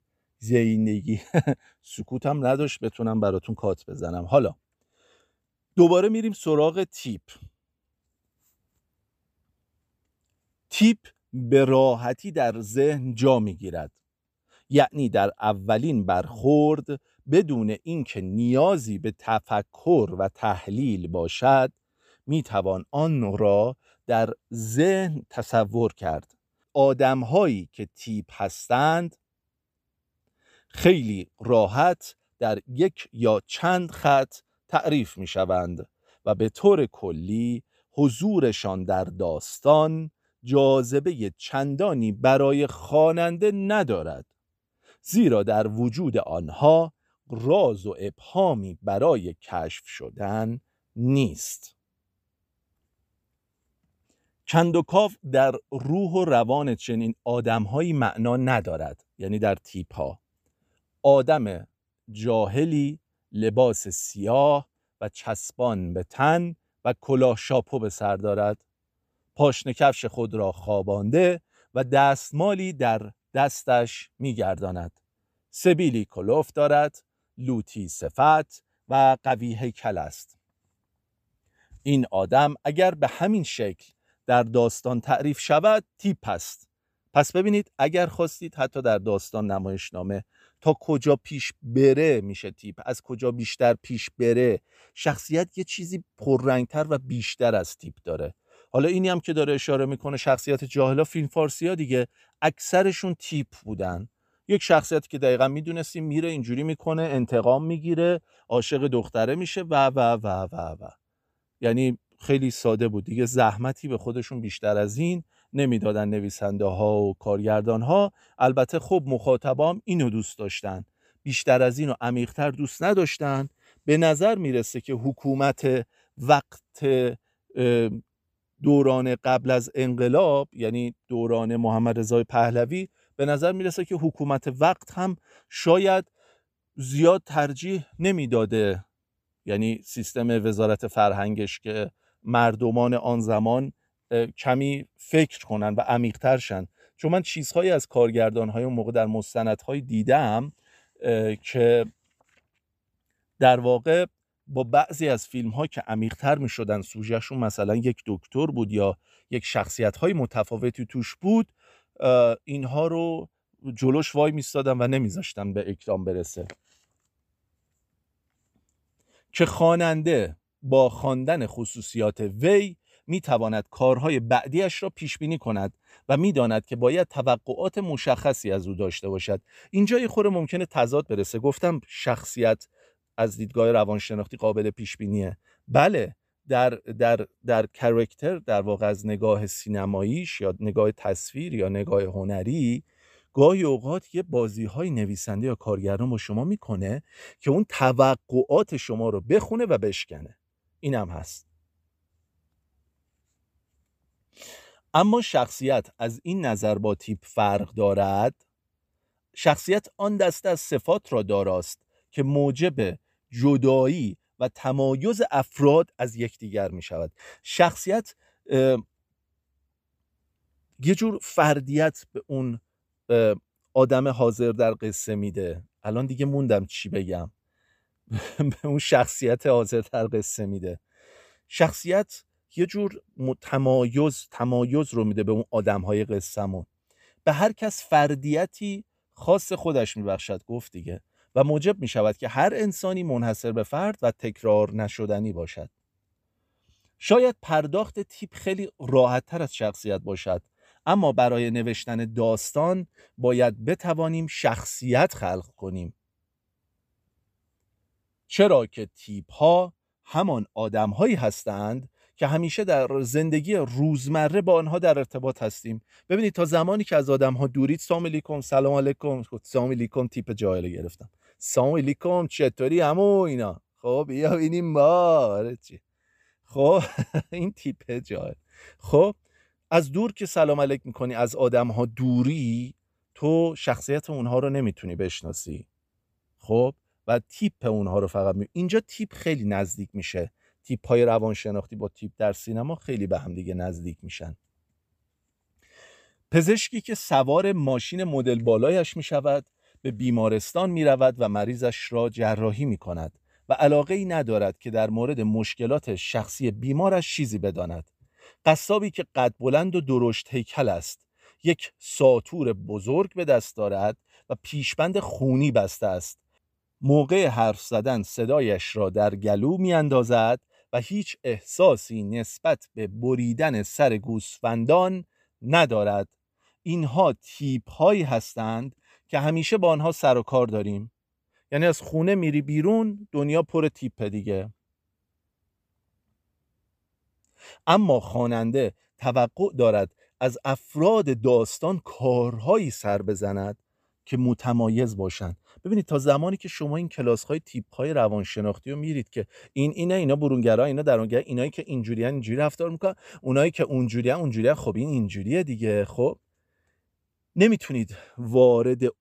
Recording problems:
none

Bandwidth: 15 kHz